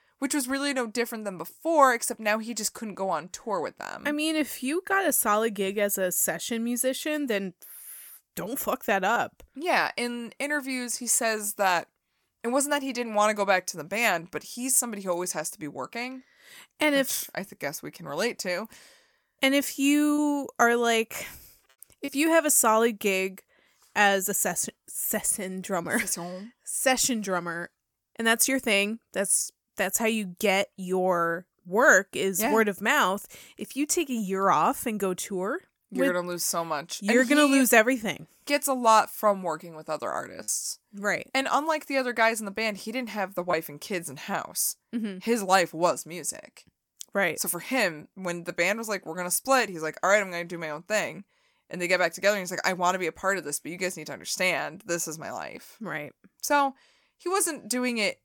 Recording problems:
choppy; occasionally; from 40 to 44 s; 2% of the speech affected

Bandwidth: 18 kHz